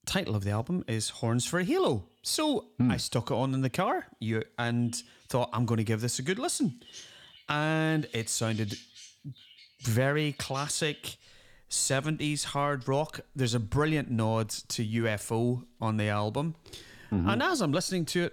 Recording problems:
animal sounds; faint; throughout; 20 dB below the speech

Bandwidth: 18.5 kHz